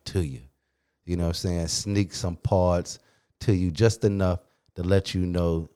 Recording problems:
none

